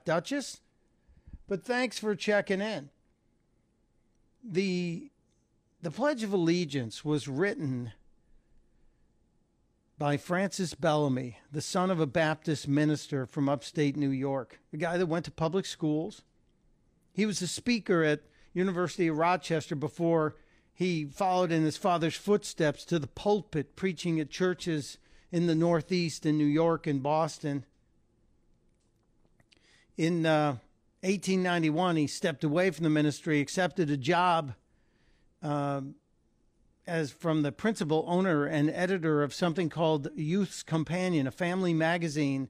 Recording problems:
none

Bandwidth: 15 kHz